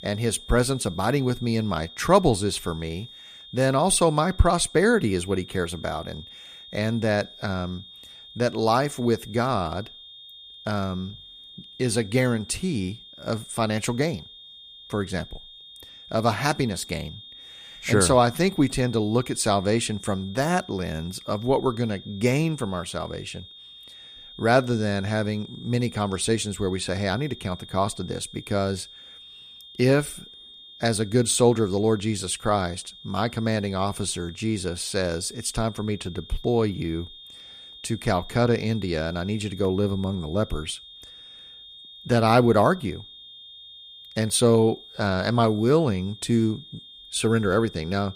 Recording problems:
high-pitched whine; noticeable; throughout; 3.5 kHz, 20 dB below the speech

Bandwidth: 15 kHz